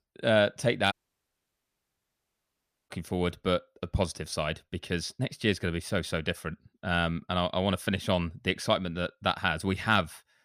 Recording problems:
audio cutting out; at 1 s for 2 s

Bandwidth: 15 kHz